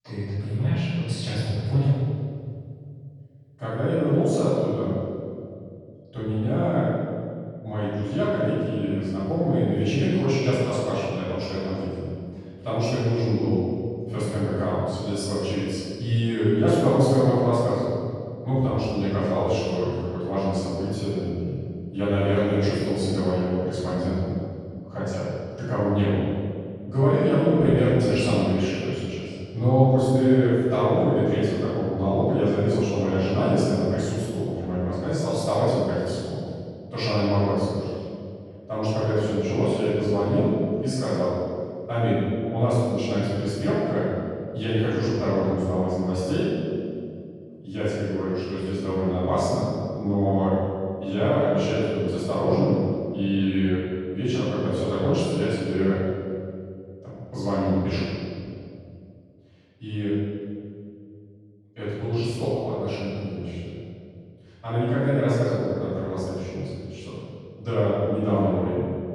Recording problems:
room echo; strong; dies away in 2.1 s
off-mic speech; far

